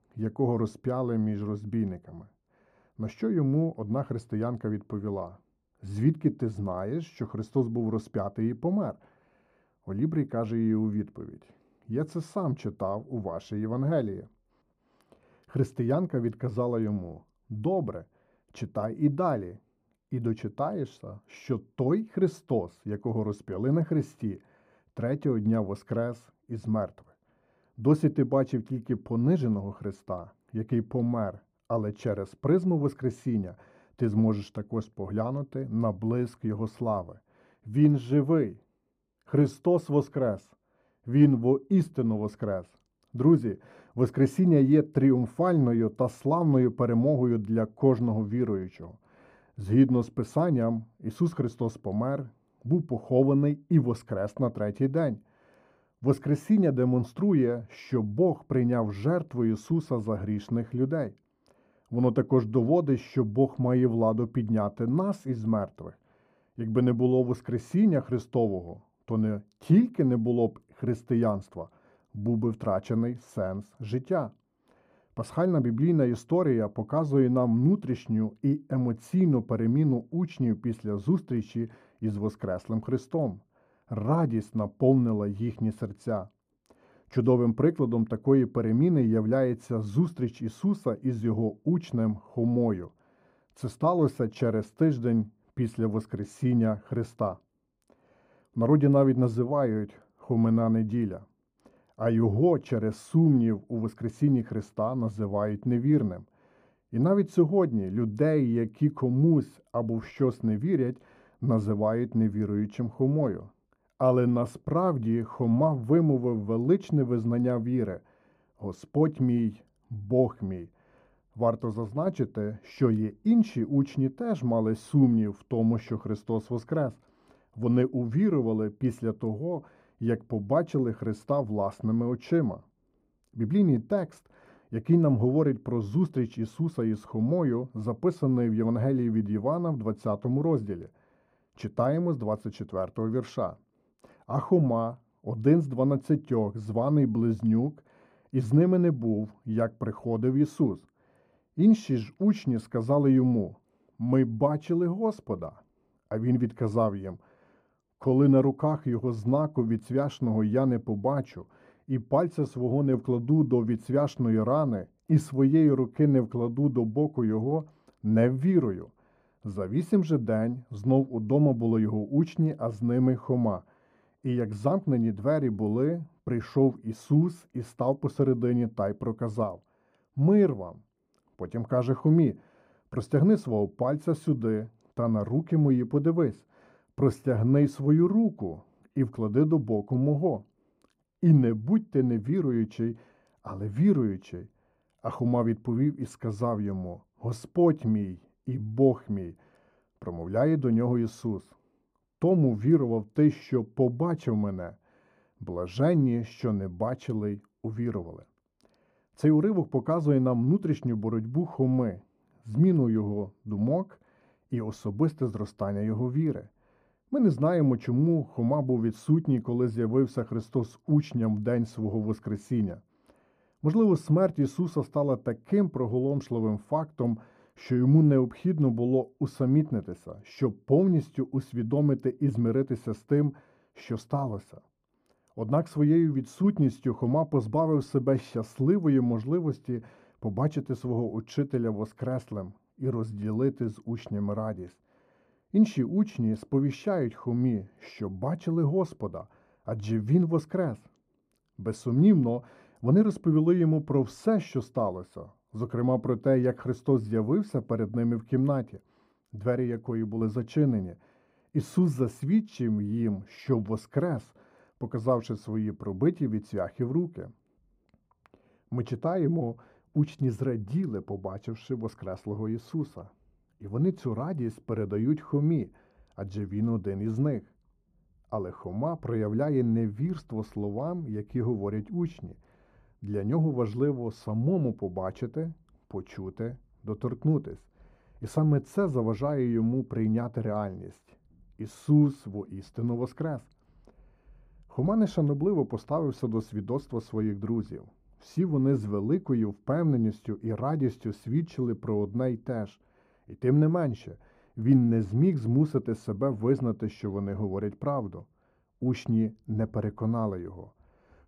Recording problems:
muffled; very; fading above 1.5 kHz

